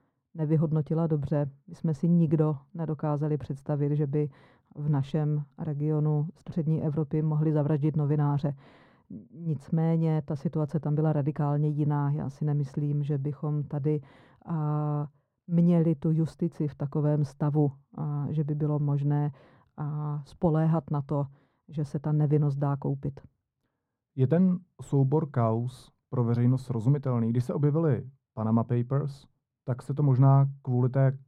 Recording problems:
muffled; very; fading above 2 kHz

